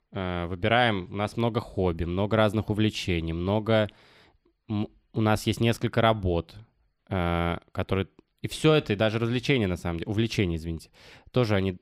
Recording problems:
none

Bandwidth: 15.5 kHz